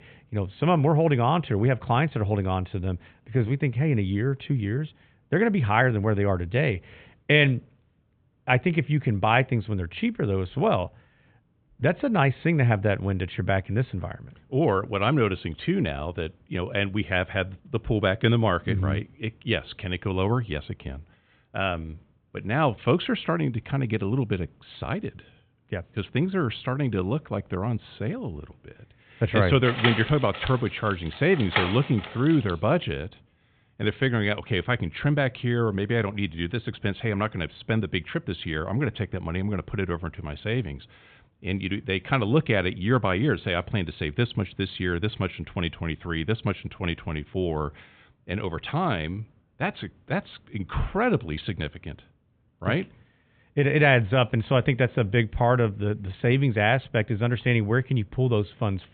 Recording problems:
high frequencies cut off; severe; nothing above 4 kHz
door banging; noticeable; from 30 to 33 s; peak level with the speech

